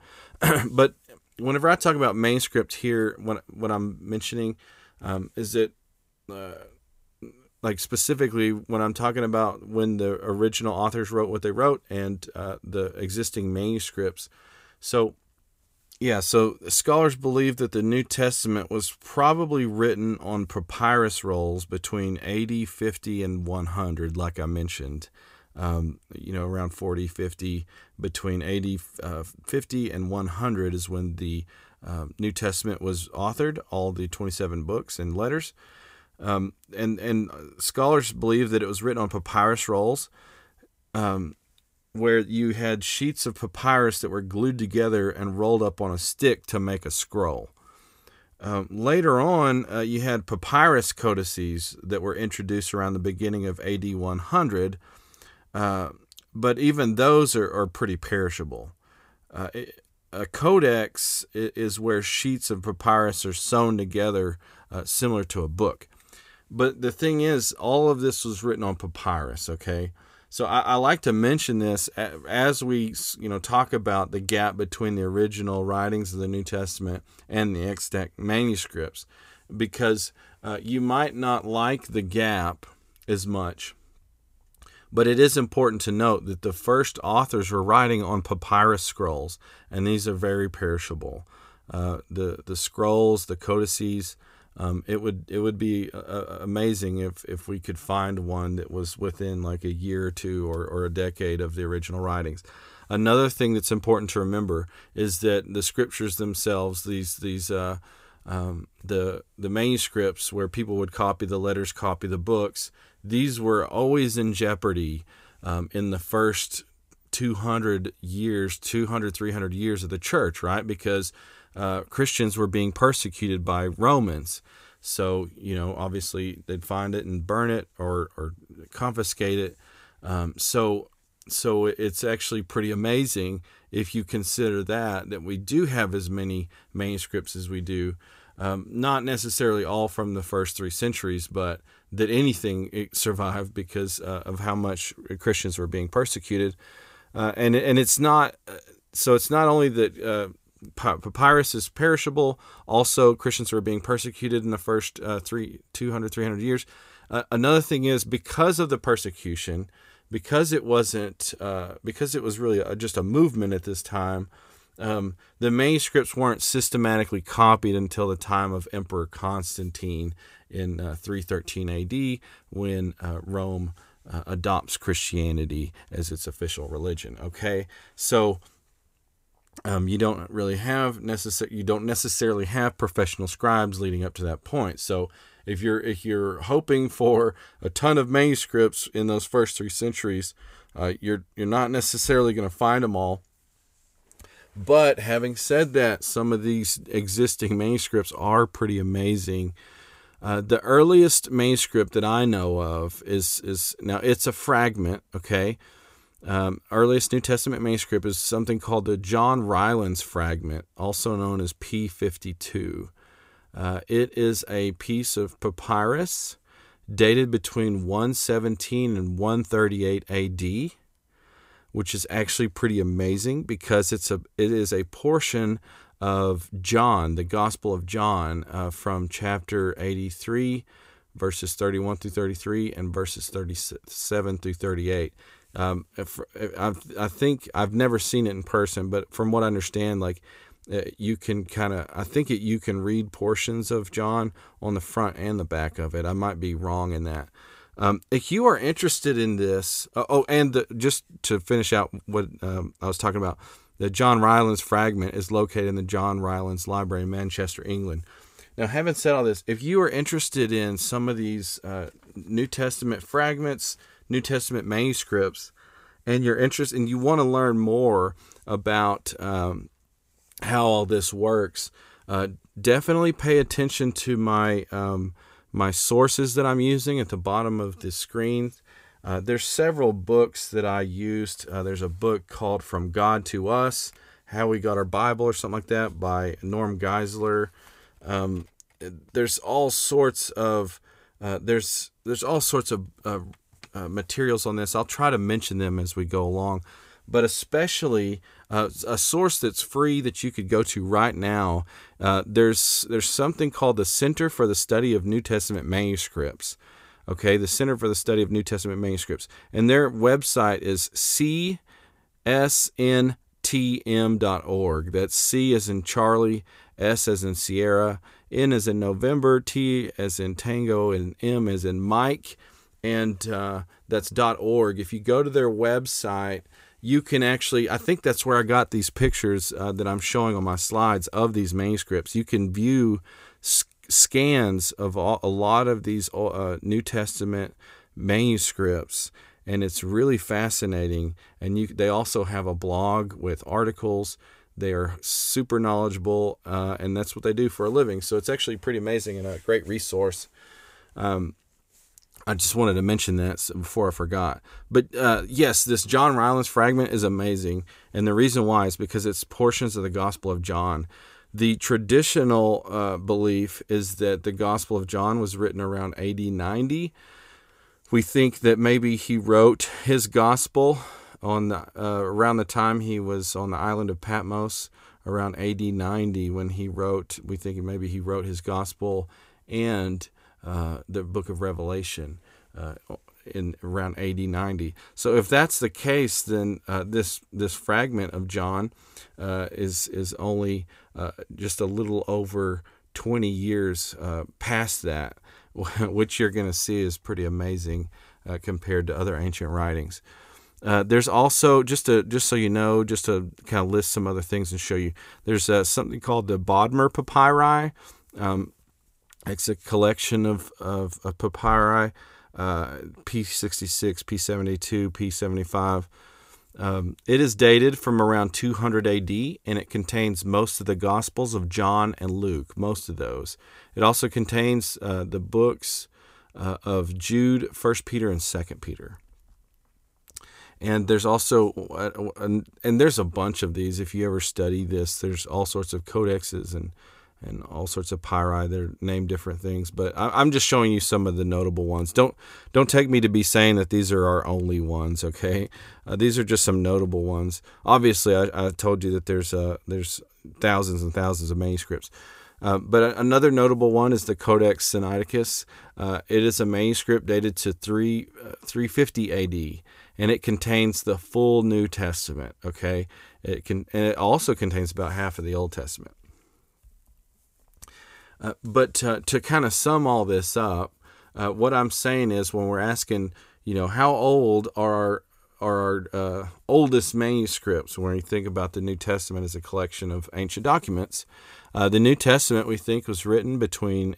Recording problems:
none

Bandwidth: 15.5 kHz